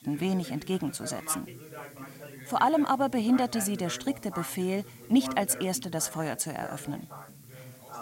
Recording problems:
background chatter; noticeable; throughout; 2 voices, 15 dB below the speech
hiss; faint; throughout; 25 dB below the speech

